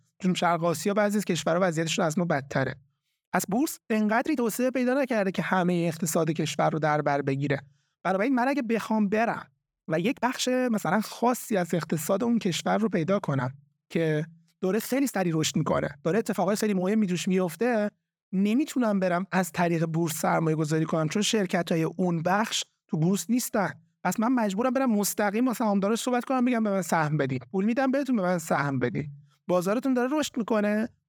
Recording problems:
uneven, jittery; strongly; from 3.5 to 29 s

